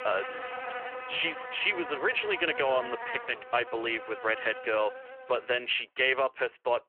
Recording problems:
thin; very; fading below 250 Hz
phone-call audio; nothing above 3 kHz
animal sounds; loud; until 5.5 s; 10 dB below the speech

